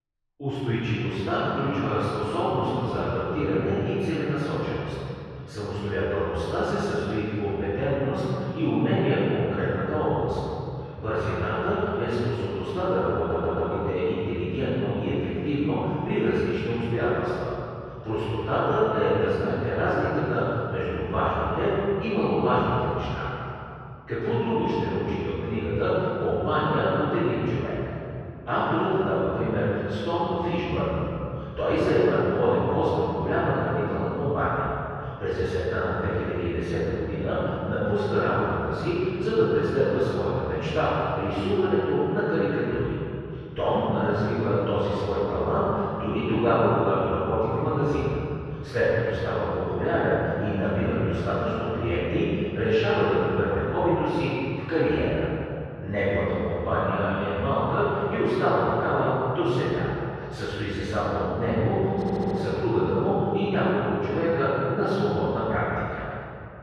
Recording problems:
room echo; strong; dies away in 2.6 s
off-mic speech; far
muffled; slightly; fading above 2.5 kHz
audio stuttering; at 13 s and at 1:02

